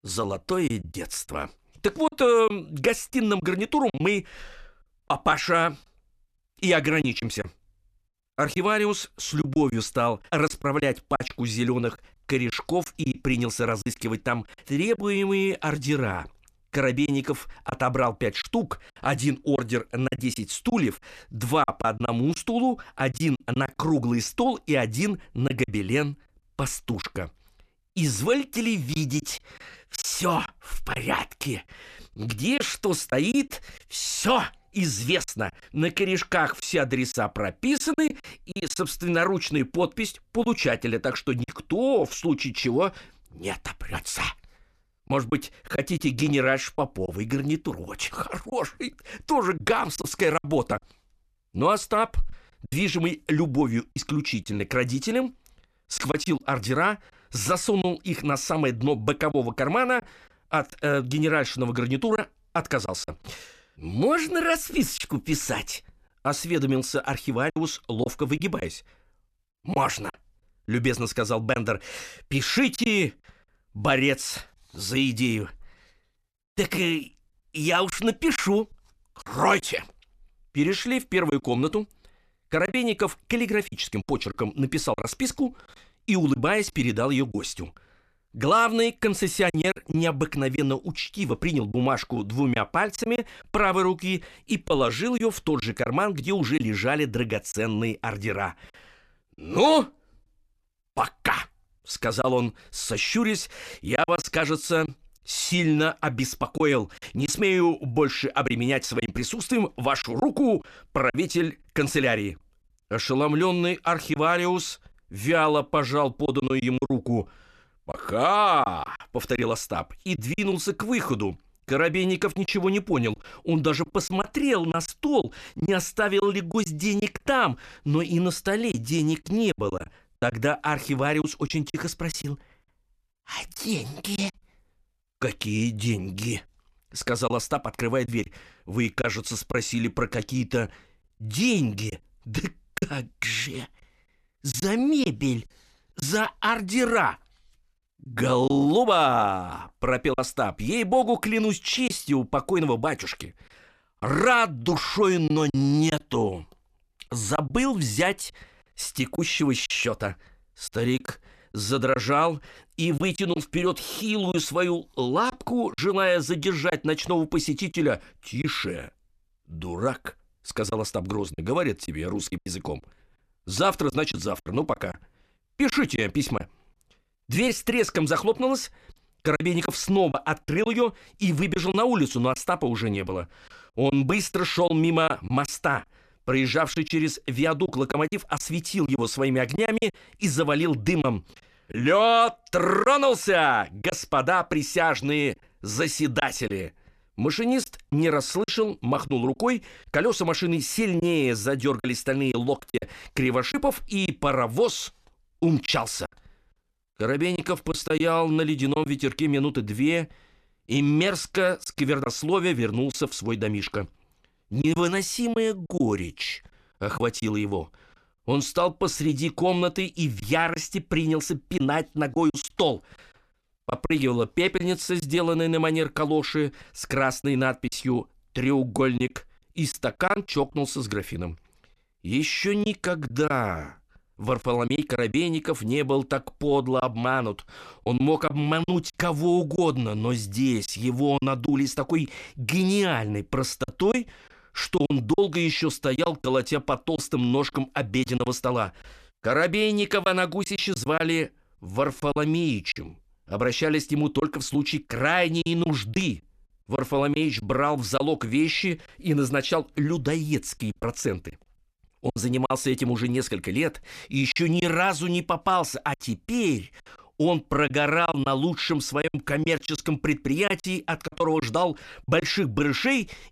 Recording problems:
choppy; occasionally; 5% of the speech affected

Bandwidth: 14.5 kHz